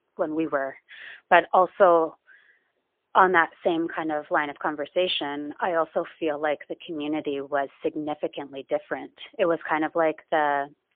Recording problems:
phone-call audio; poor line

